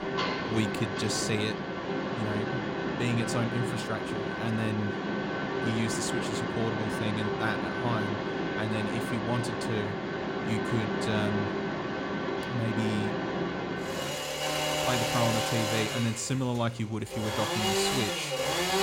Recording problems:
machinery noise; very loud; throughout; 2 dB above the speech

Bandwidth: 16 kHz